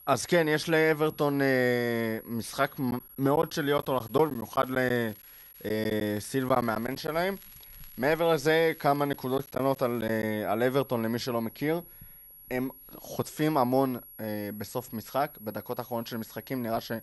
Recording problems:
high-pitched whine; noticeable; throughout; 11.5 kHz, 20 dB below the speech
crackling; faint; from 4 to 10 s; 30 dB below the speech
choppy; very; from 3 to 7 s and from 9 to 10 s; 8% of the speech affected

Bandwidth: 14 kHz